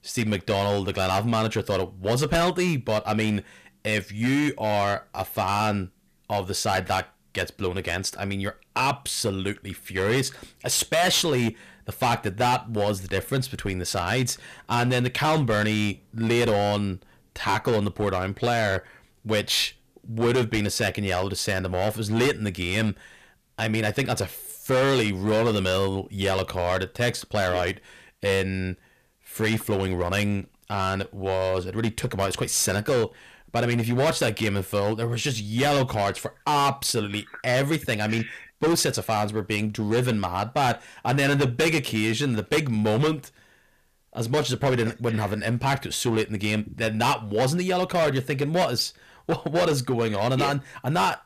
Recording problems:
distortion; heavy; 9% of the sound clipped

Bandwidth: 14.5 kHz